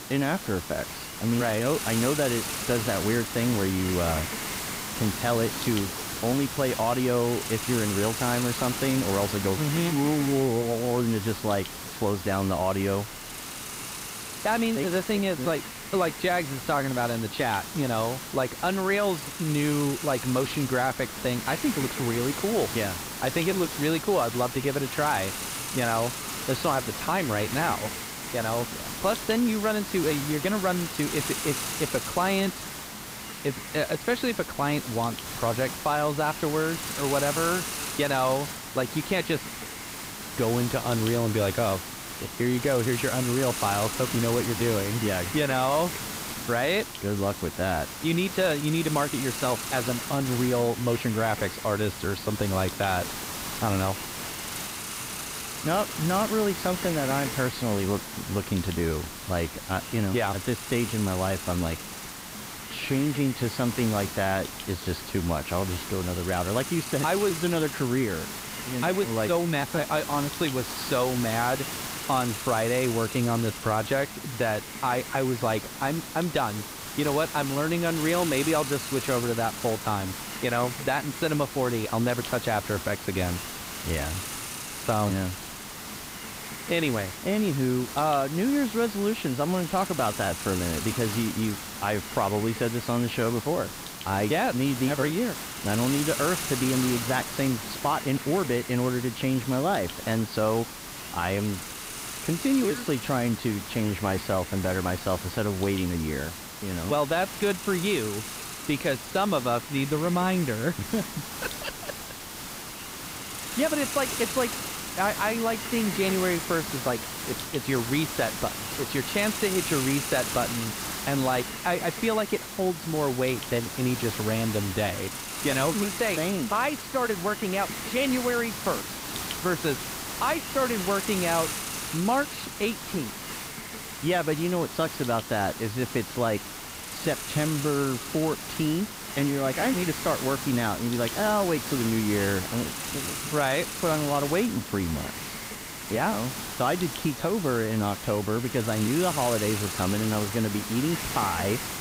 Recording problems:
high frequencies cut off; severe; nothing above 5 kHz
hiss; loud; throughout; 6 dB below the speech

